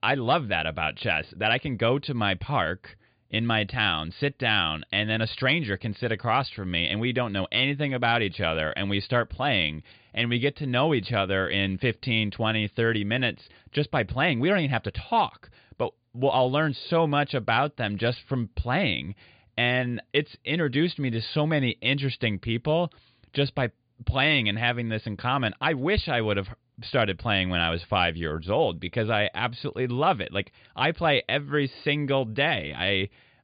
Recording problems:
high frequencies cut off; severe; nothing above 5 kHz

